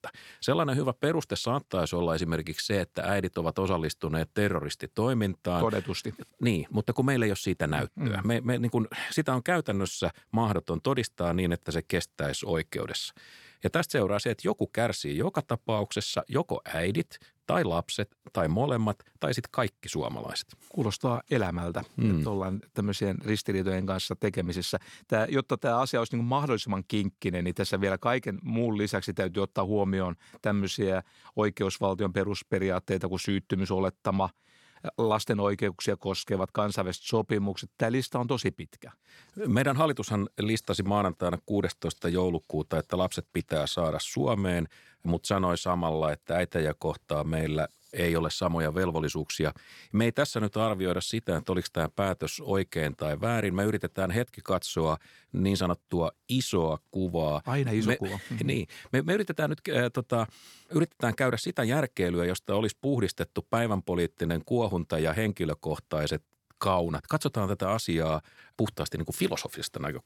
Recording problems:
none

